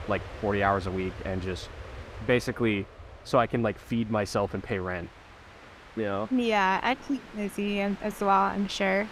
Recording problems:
train or aircraft noise; noticeable; throughout; 15 dB below the speech

